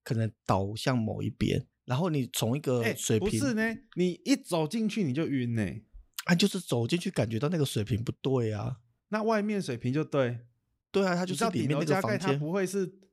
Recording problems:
none

